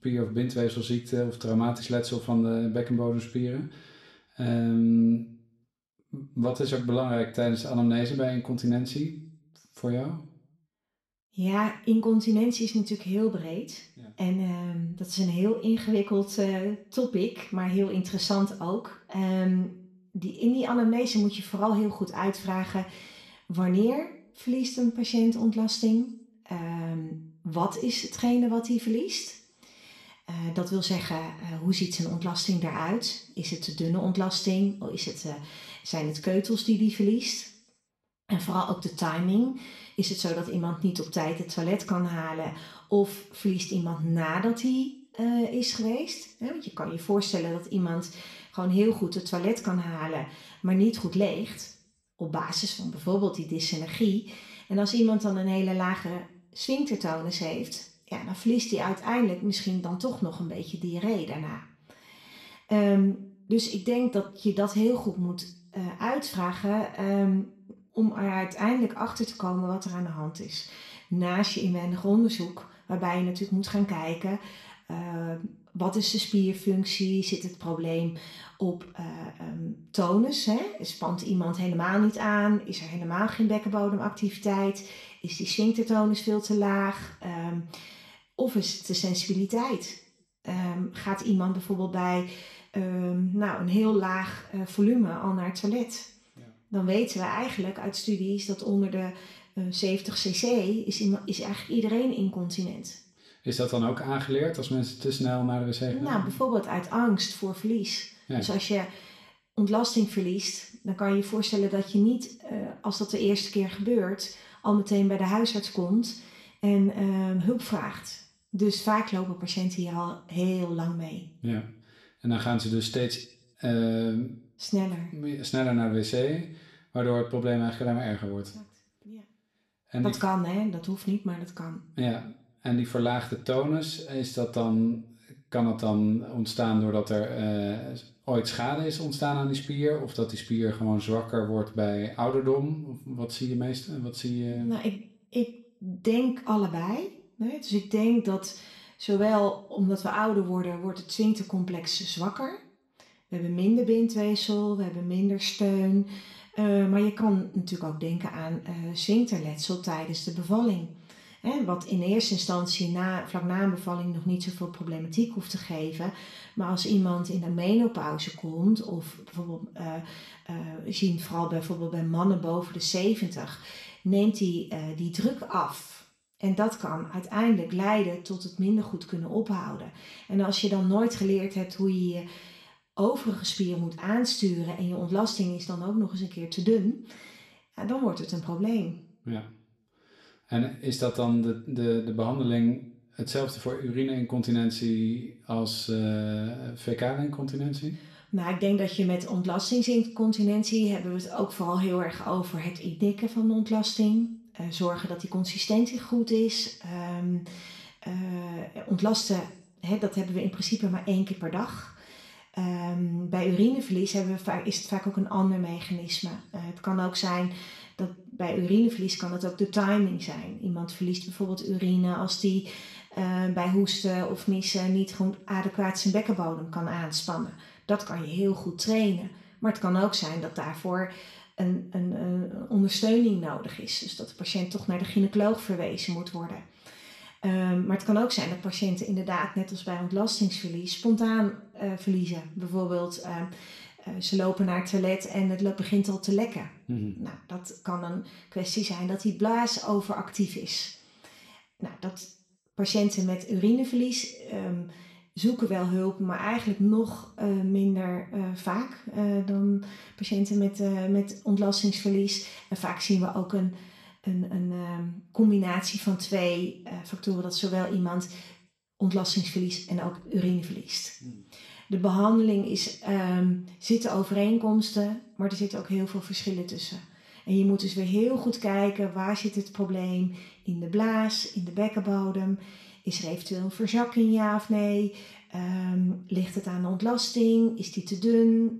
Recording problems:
room echo; slight; dies away in 0.5 s
off-mic speech; somewhat distant

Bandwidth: 13.5 kHz